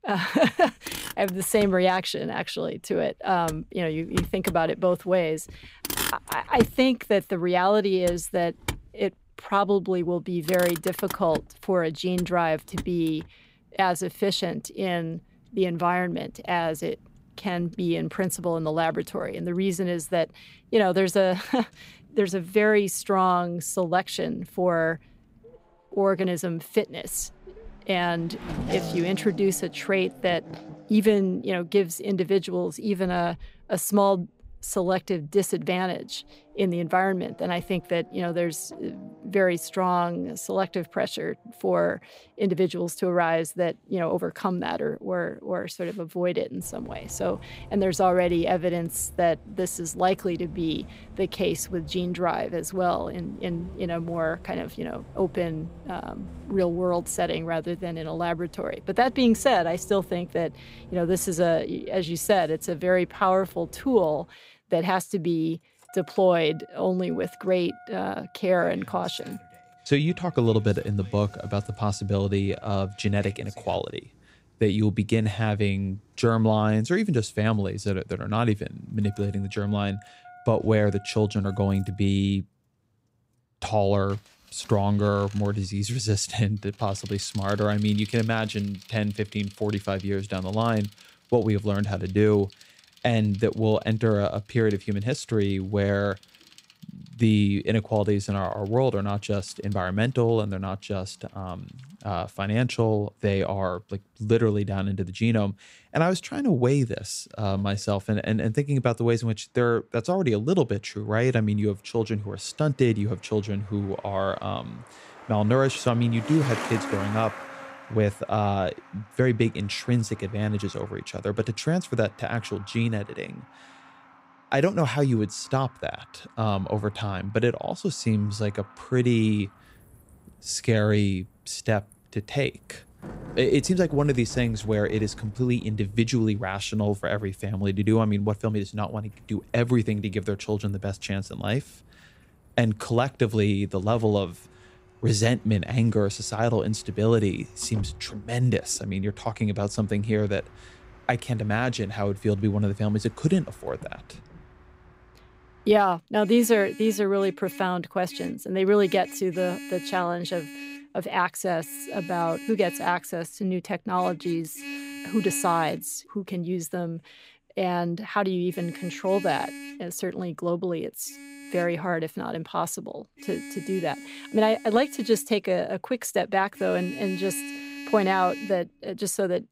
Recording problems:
traffic noise; noticeable; throughout; 15 dB below the speech

